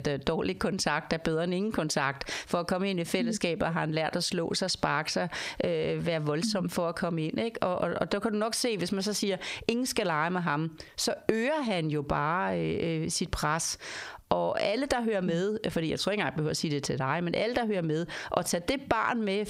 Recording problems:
squashed, flat; heavily

